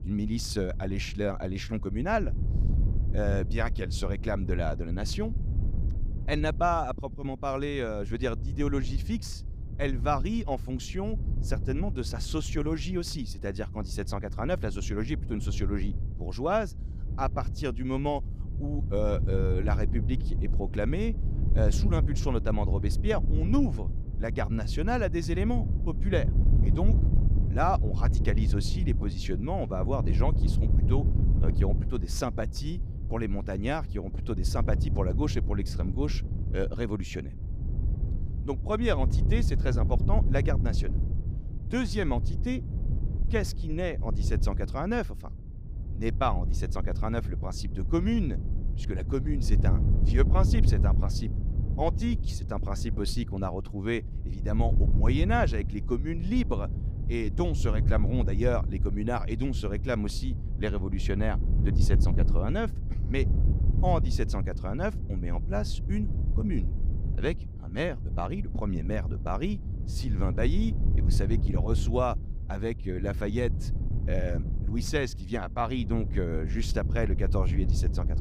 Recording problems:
wind noise on the microphone; occasional gusts; 10 dB below the speech

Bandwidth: 15.5 kHz